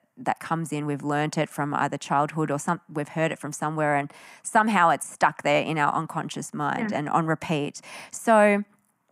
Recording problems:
none

